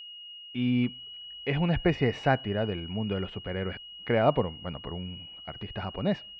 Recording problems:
muffled; very; fading above 2.5 kHz
high-pitched whine; noticeable; throughout; 3 kHz, 10 dB below the speech

